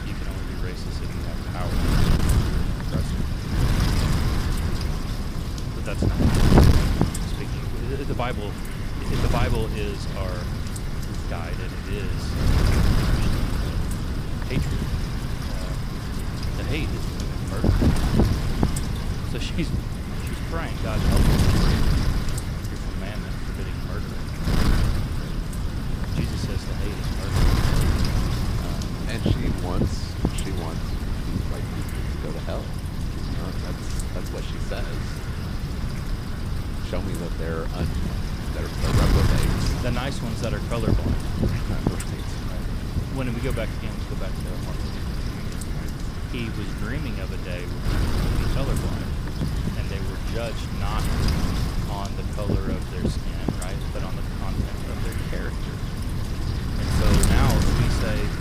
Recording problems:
wind noise on the microphone; heavy; 4 dB above the speech

